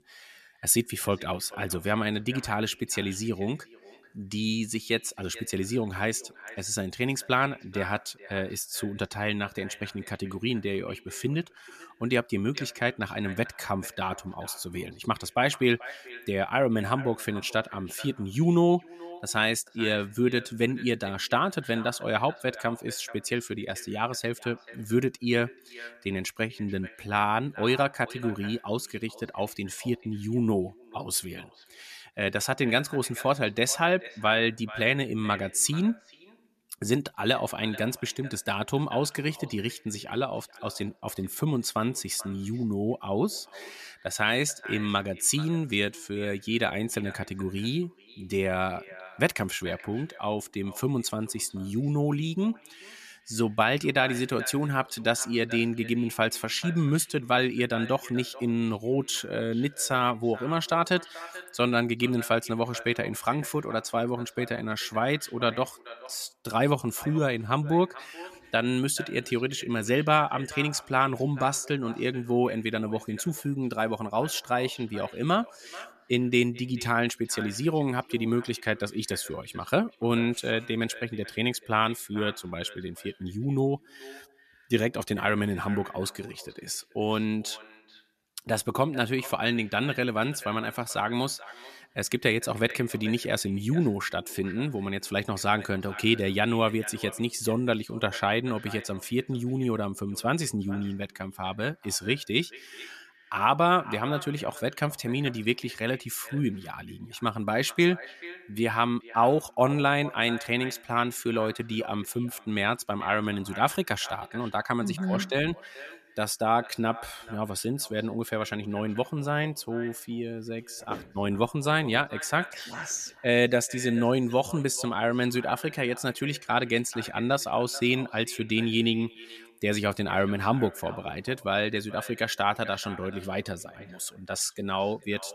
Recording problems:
echo of what is said; noticeable; throughout; 440 ms later, 15 dB below the speech

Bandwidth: 14.5 kHz